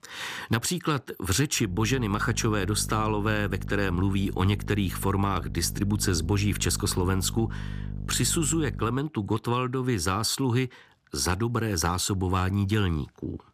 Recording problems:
electrical hum; noticeable; from 1.5 to 9 s; 50 Hz, 20 dB below the speech

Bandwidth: 14.5 kHz